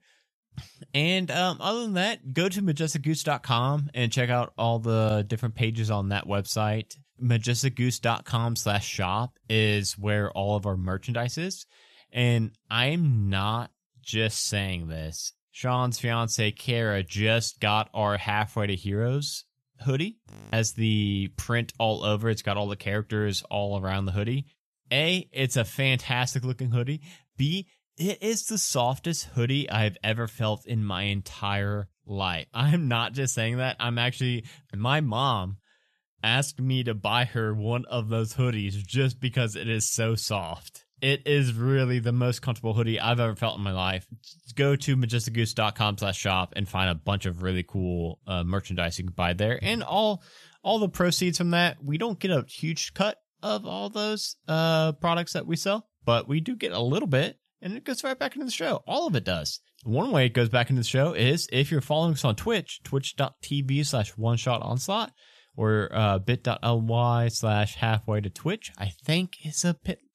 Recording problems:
audio freezing; at 20 s

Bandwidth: 13.5 kHz